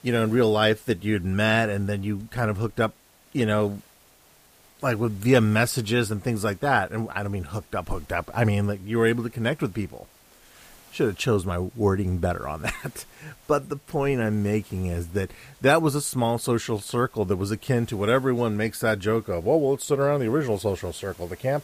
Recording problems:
hiss; faint; throughout; 30 dB below the speech

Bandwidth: 15 kHz